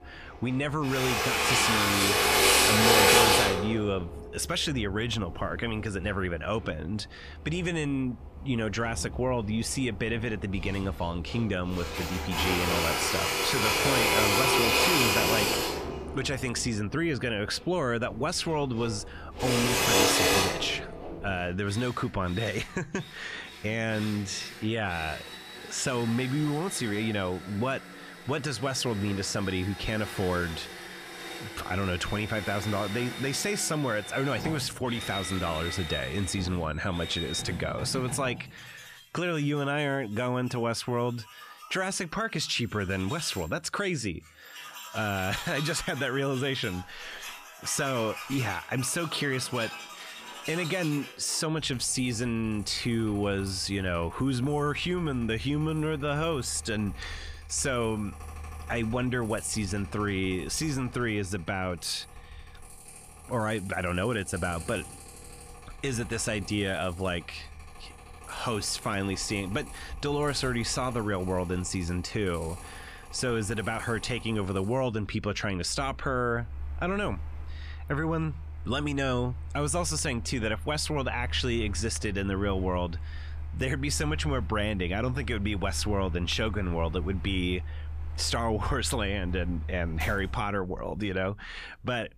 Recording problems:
machinery noise; very loud; throughout; as loud as the speech

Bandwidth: 14.5 kHz